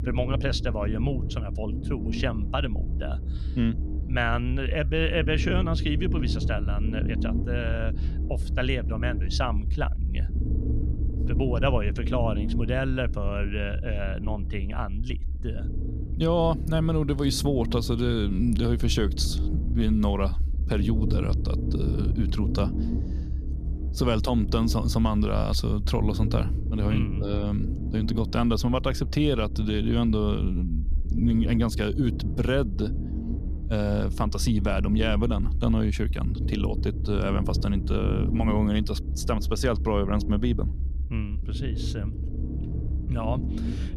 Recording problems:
low rumble; noticeable; throughout; 10 dB below the speech

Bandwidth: 14.5 kHz